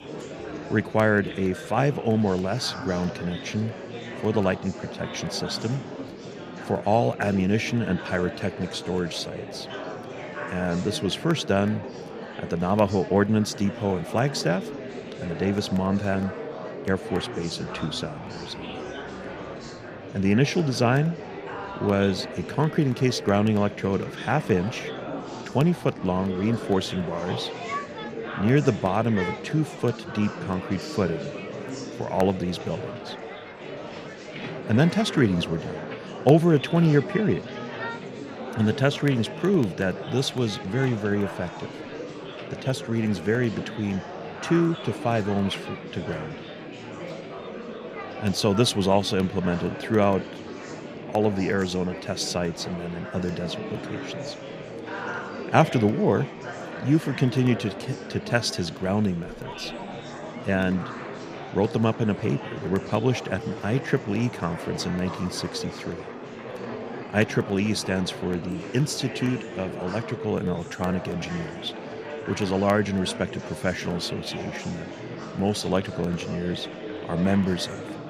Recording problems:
murmuring crowd; noticeable; throughout; 10 dB below the speech

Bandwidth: 15 kHz